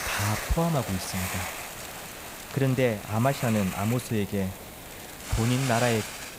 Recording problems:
hiss; loud; throughout; 7 dB below the speech

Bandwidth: 15.5 kHz